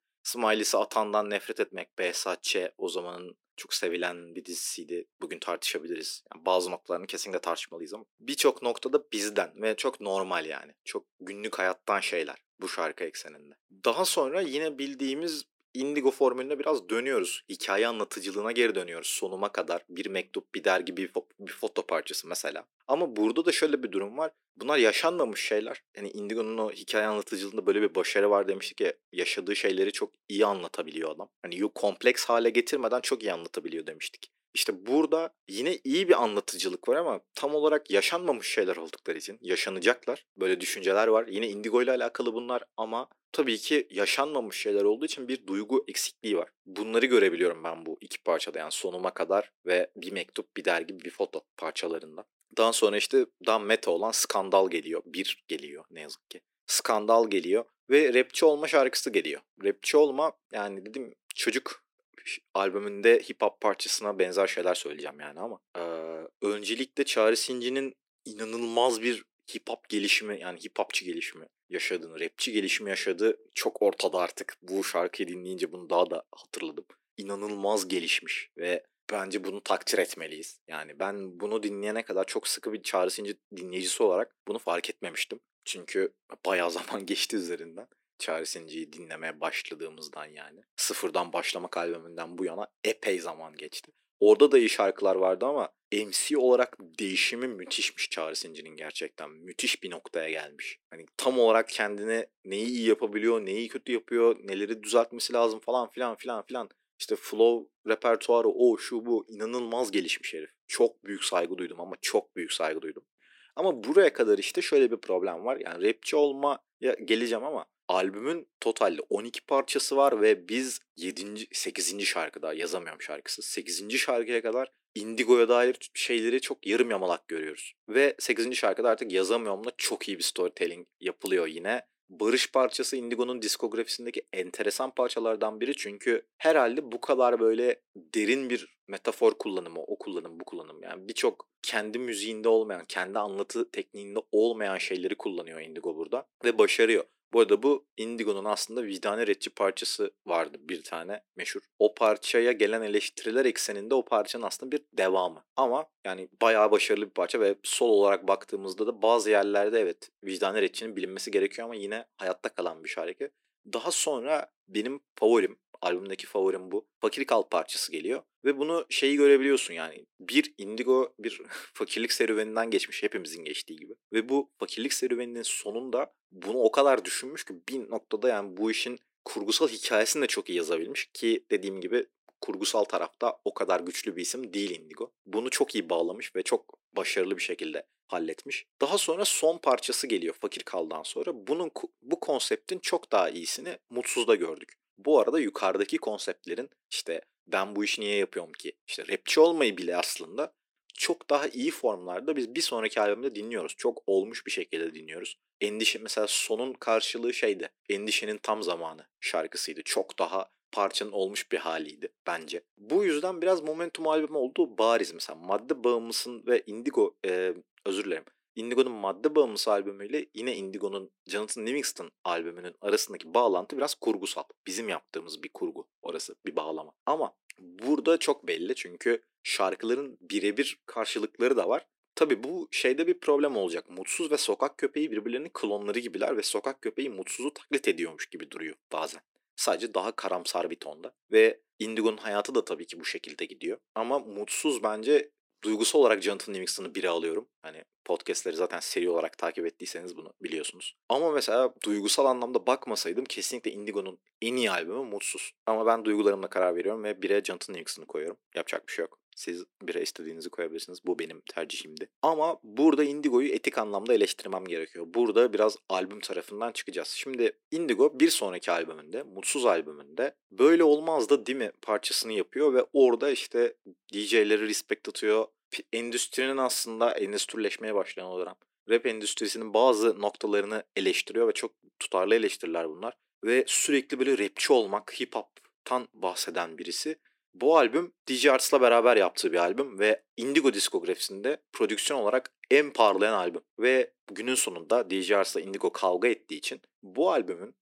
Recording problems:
thin; somewhat; fading below 300 Hz

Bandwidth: 16 kHz